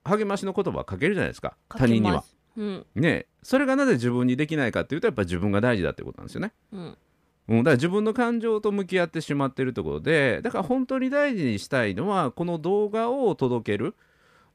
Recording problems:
none

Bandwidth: 15 kHz